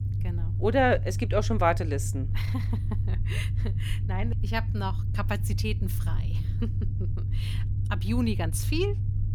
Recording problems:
low rumble; noticeable; throughout; 15 dB below the speech

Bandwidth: 18.5 kHz